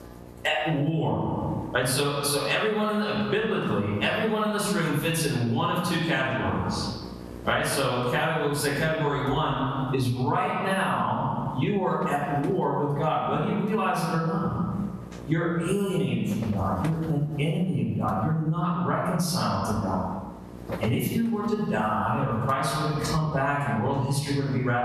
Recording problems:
off-mic speech; far
room echo; noticeable; dies away in 1 s
squashed, flat; somewhat
electrical hum; noticeable; throughout; 60 Hz, 20 dB below the speech

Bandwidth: 13.5 kHz